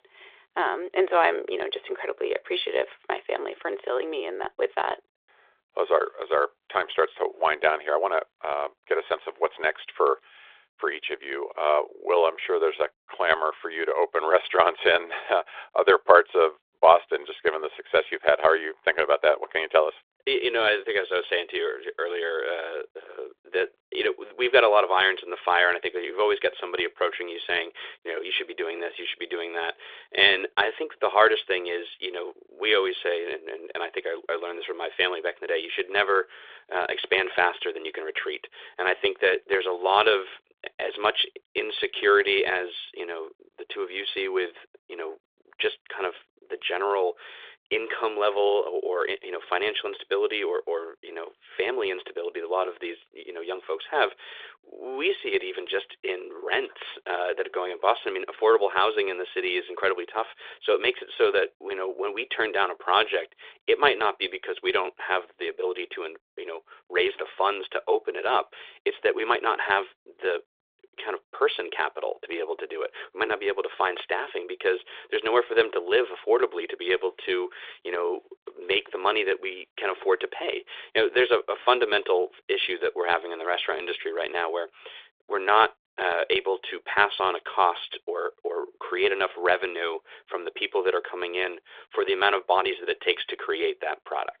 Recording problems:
phone-call audio

